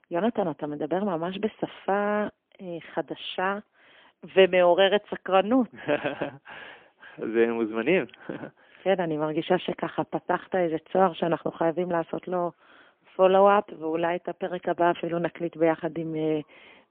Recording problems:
phone-call audio; poor line; nothing above 3.5 kHz

